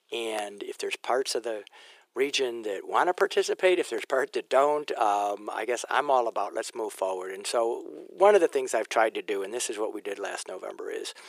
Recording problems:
thin; very; fading below 350 Hz

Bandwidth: 15 kHz